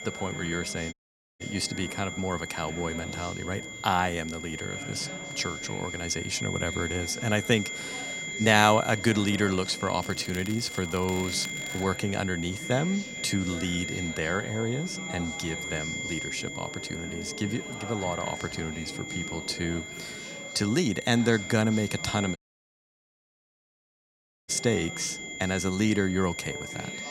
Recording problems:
high-pitched whine; loud; throughout; 2 kHz, 7 dB below the speech
chatter from many people; noticeable; throughout; 15 dB below the speech
crackling; noticeable; from 10 to 12 s; 15 dB below the speech
audio cutting out; at 1 s and at 22 s for 2 s

